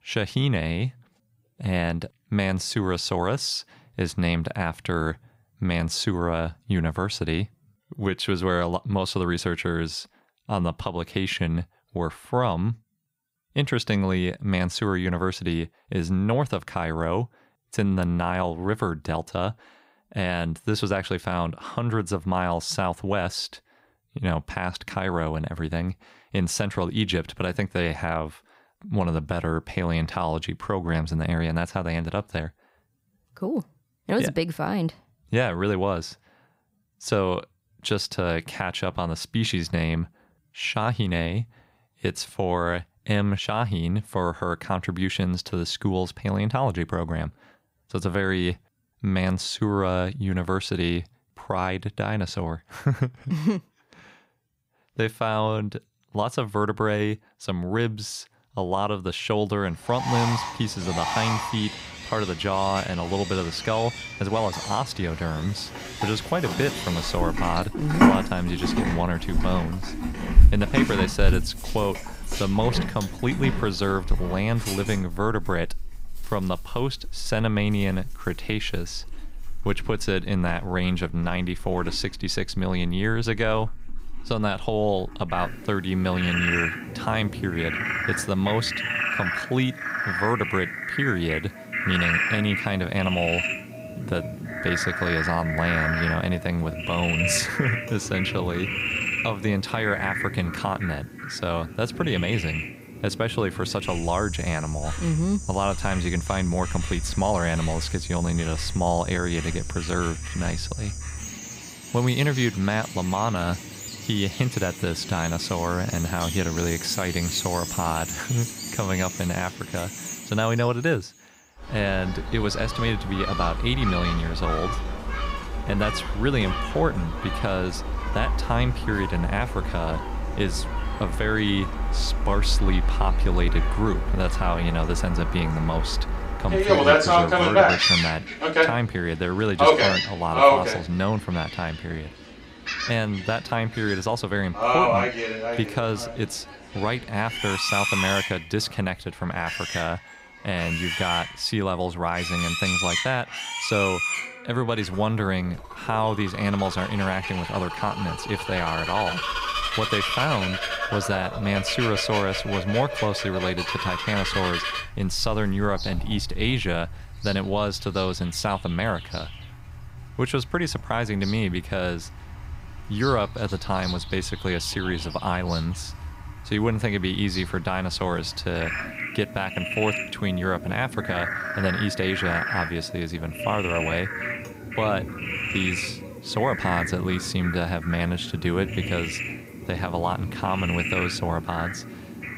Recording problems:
animal sounds; loud; from 1:00 on; 1 dB below the speech

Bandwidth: 15.5 kHz